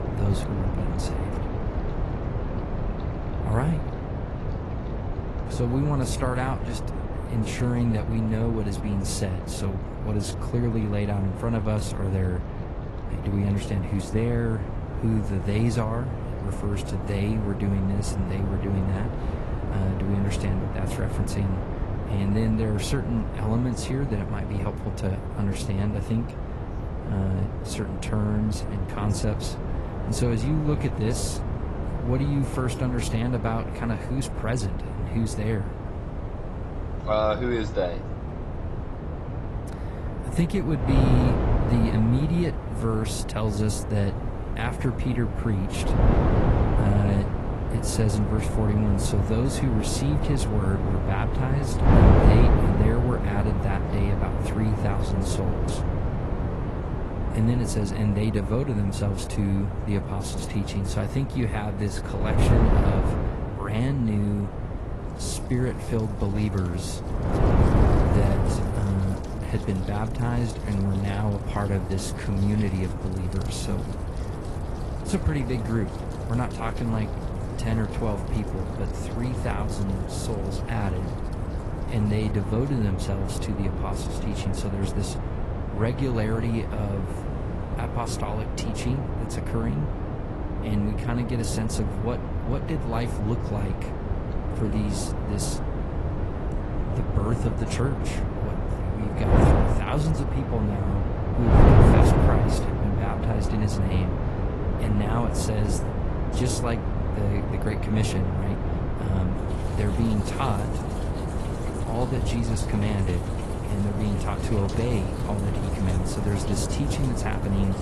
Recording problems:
garbled, watery; slightly; nothing above 11.5 kHz
wind noise on the microphone; heavy; 1 dB below the speech
rain or running water; faint; throughout; 25 dB below the speech

